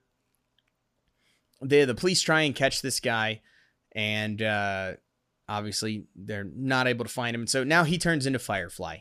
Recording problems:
none

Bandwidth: 15 kHz